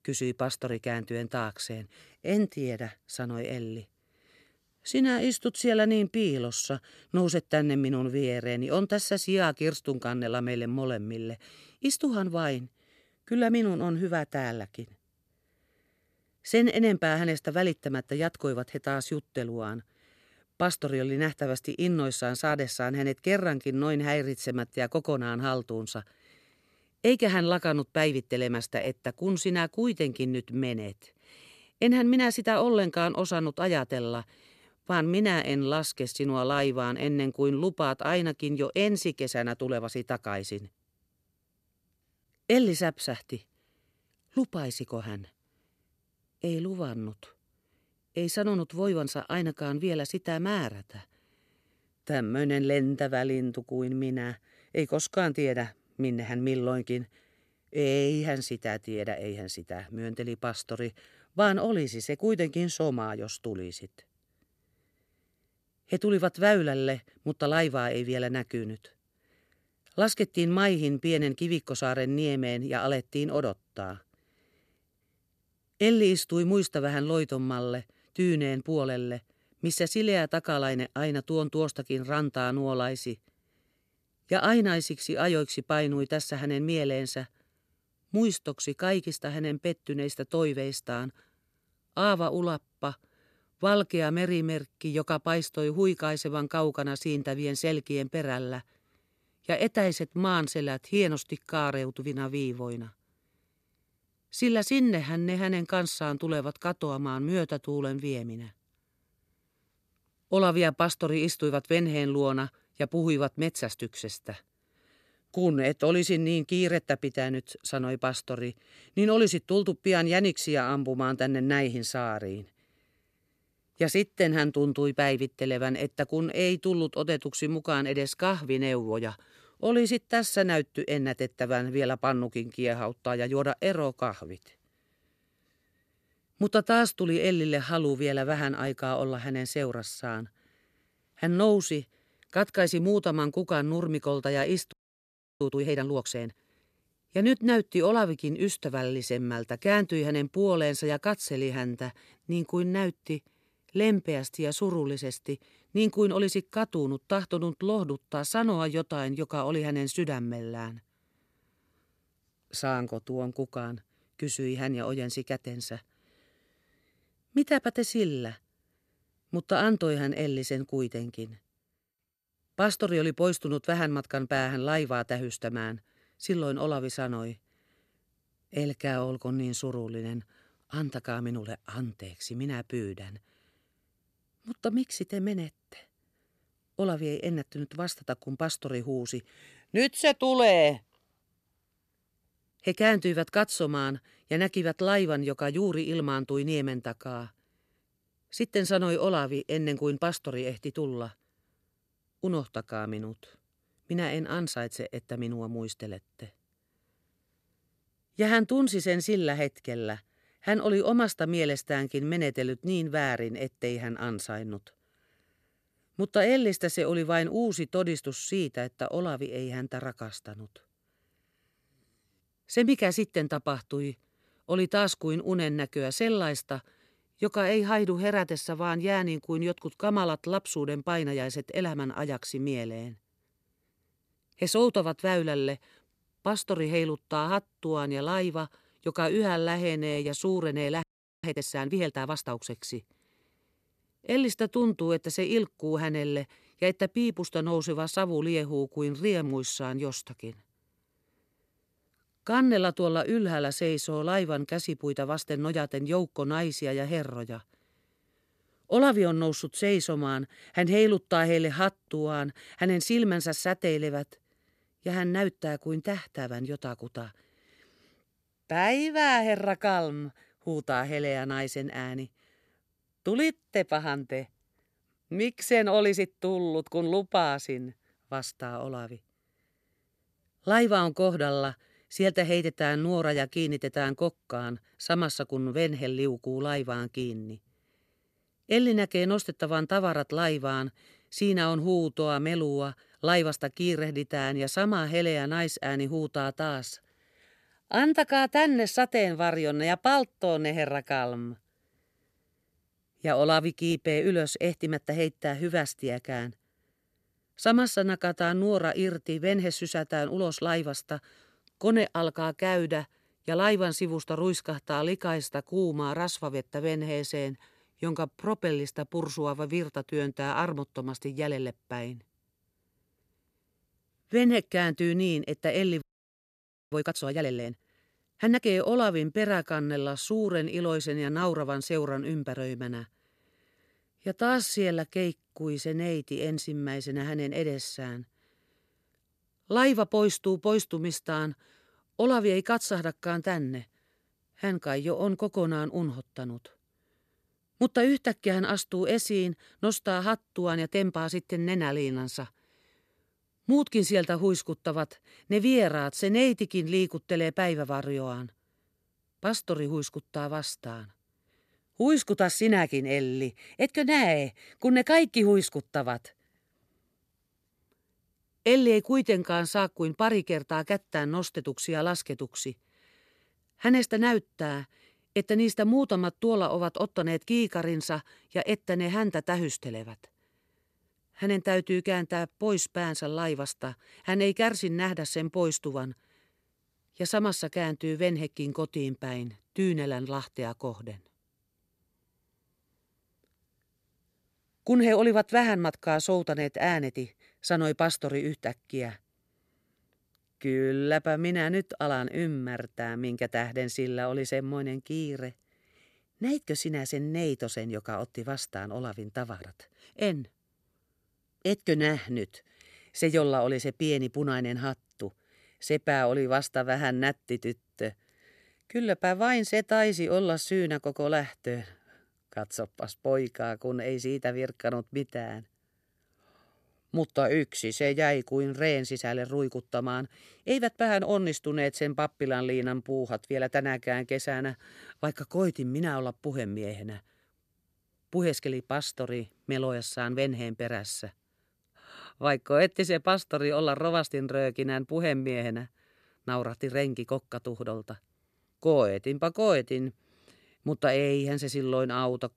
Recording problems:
audio freezing; at 2:25 for 0.5 s, at 4:01 and at 5:26 for 1 s

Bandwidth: 14 kHz